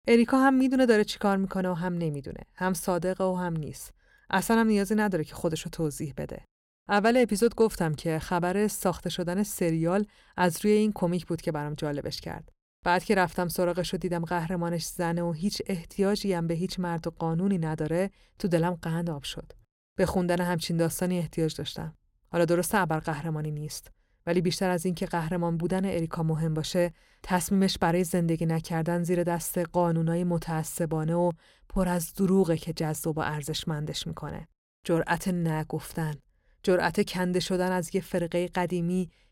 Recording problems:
none

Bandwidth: 16.5 kHz